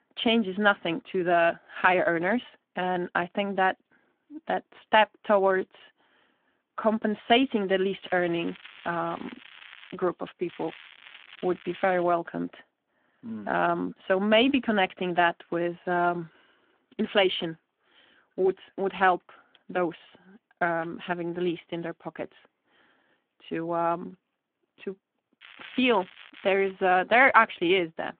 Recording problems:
phone-call audio
crackling; faint; from 8 to 10 s, from 10 to 12 s and from 25 to 27 s; 20 dB below the speech

